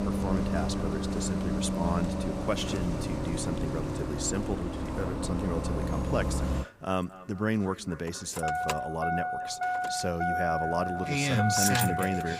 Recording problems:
echo of what is said; noticeable; throughout; 230 ms later, 20 dB below the speech
traffic noise; very loud; throughout; 3 dB above the speech

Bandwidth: 15.5 kHz